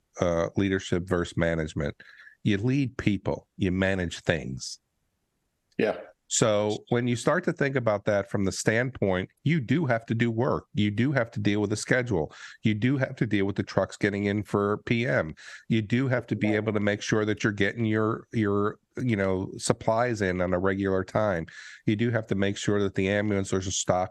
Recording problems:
squashed, flat; somewhat

